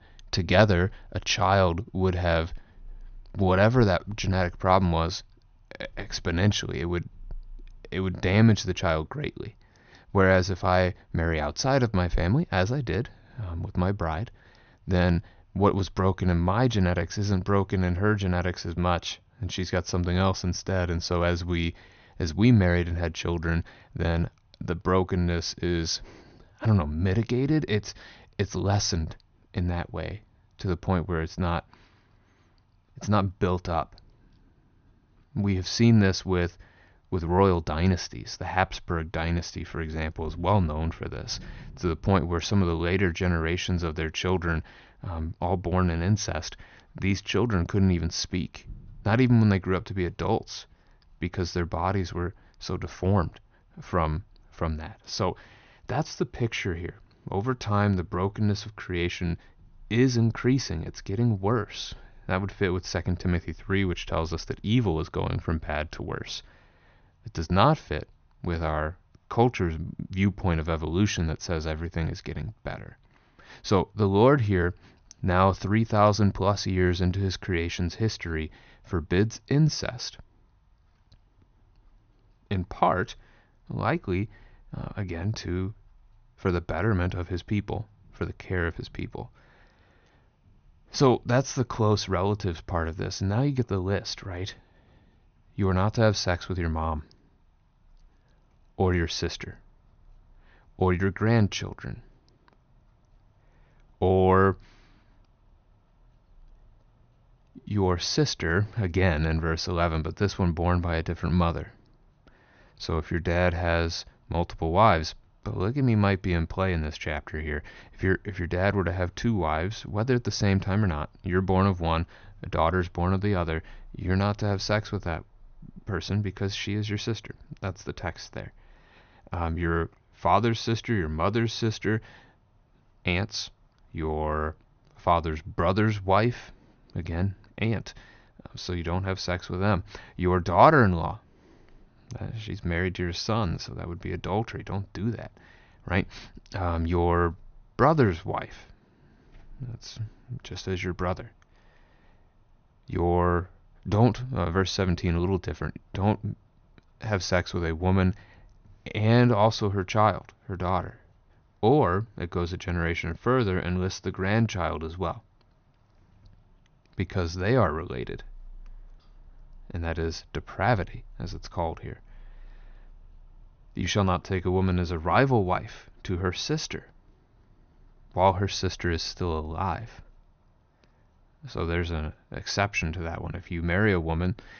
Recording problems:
high frequencies cut off; noticeable; nothing above 6.5 kHz

